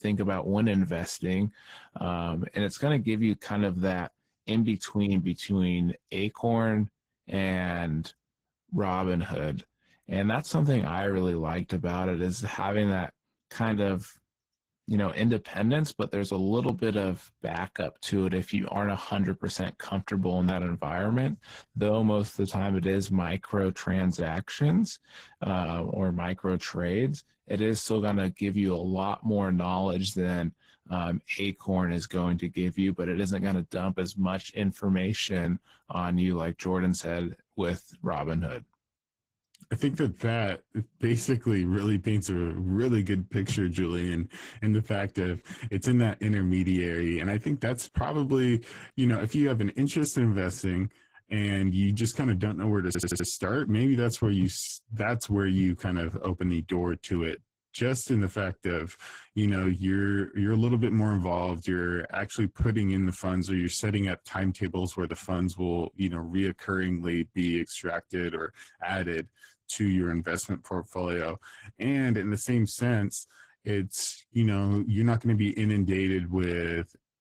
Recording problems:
garbled, watery; slightly; nothing above 15.5 kHz
audio stuttering; at 53 s

